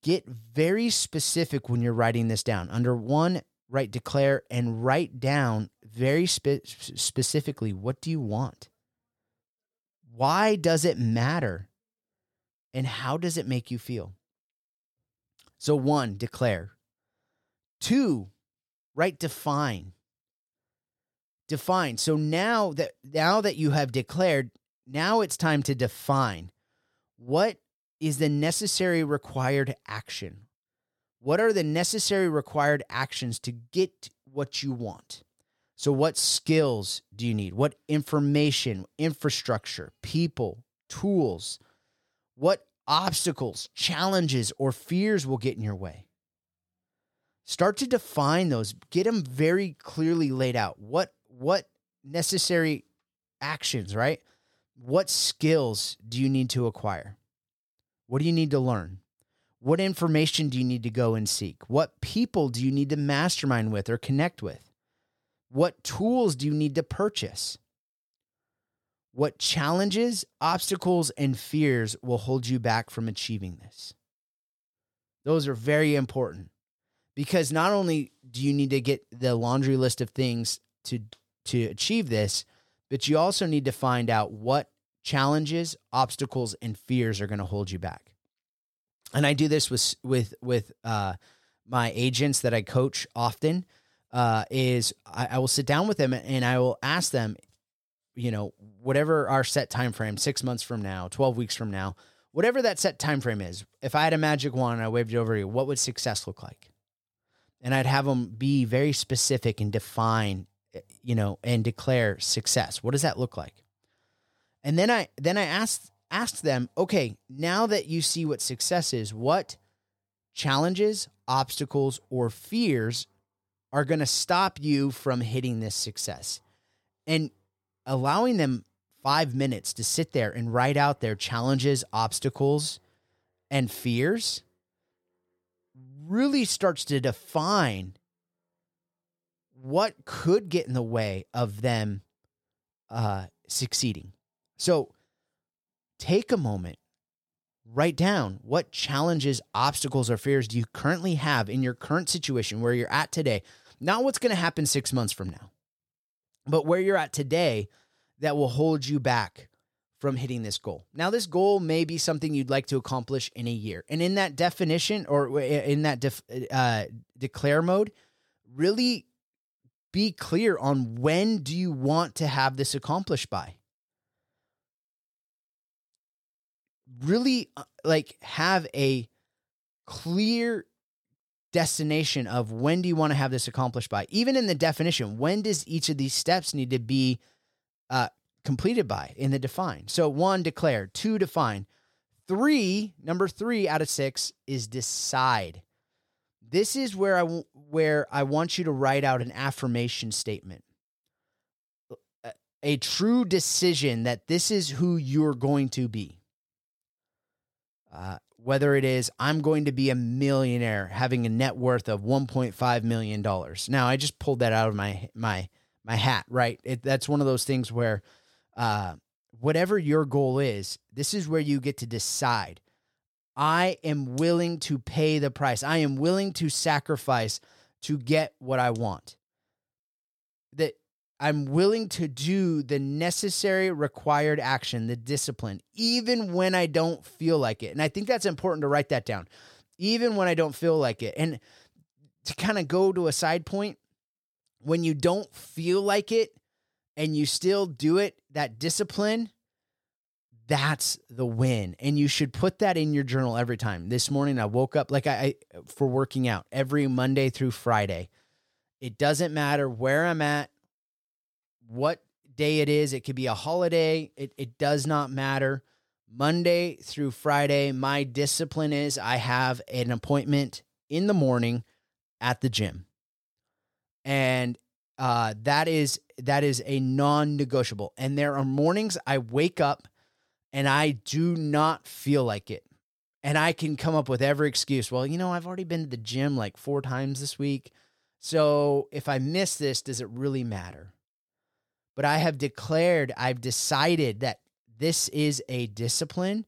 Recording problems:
none

